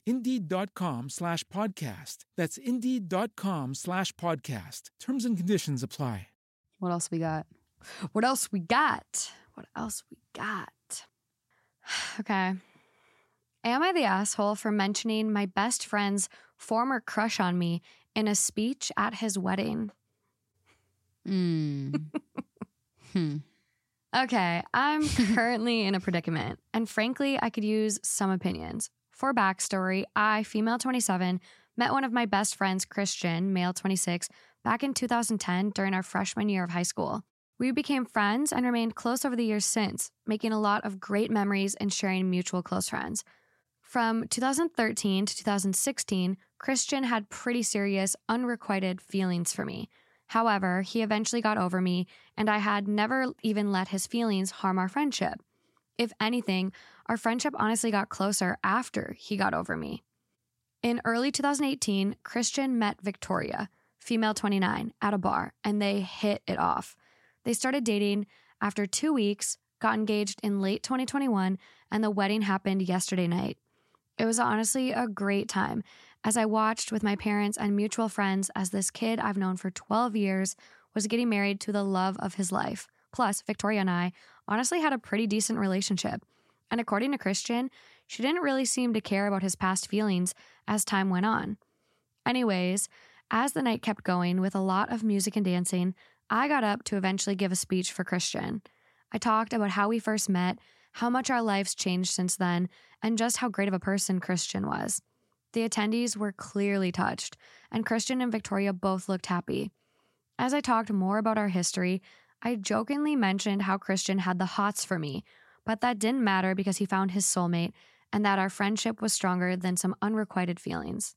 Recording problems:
uneven, jittery; strongly; from 1:14 to 1:44

